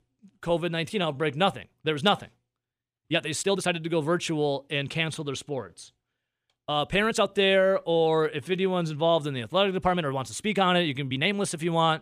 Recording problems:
uneven, jittery; strongly; from 1 to 11 s

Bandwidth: 14.5 kHz